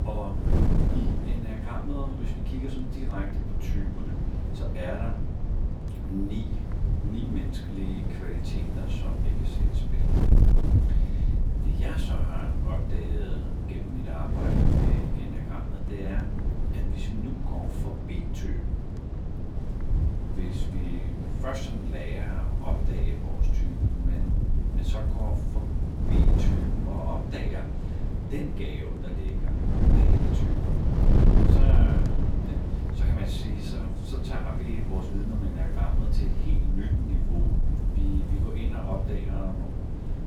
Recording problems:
off-mic speech; far
room echo; slight; dies away in 0.4 s
wind noise on the microphone; heavy; 1 dB above the speech

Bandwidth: 18 kHz